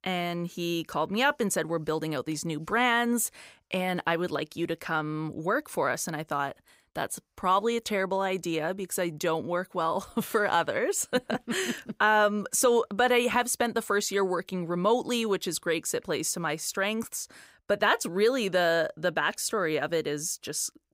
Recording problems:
none

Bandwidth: 15.5 kHz